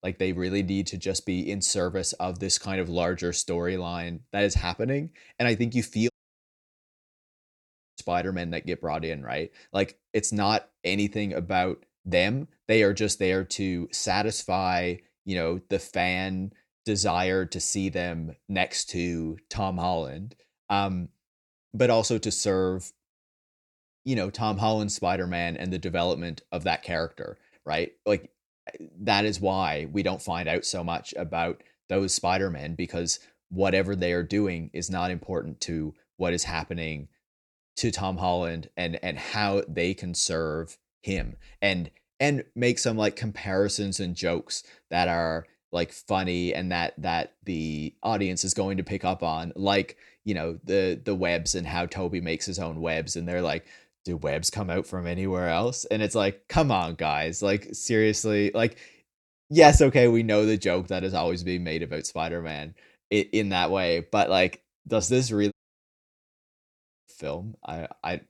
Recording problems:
audio cutting out; at 6 s for 2 s and at 1:06 for 1.5 s

